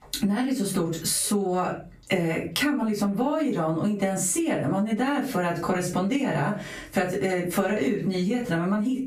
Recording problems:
off-mic speech; far
squashed, flat; heavily
room echo; slight; dies away in 0.2 s

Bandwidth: 15 kHz